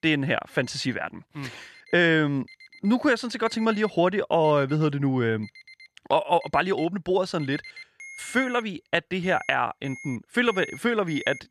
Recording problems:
alarms or sirens; noticeable; throughout; 20 dB below the speech

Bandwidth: 14.5 kHz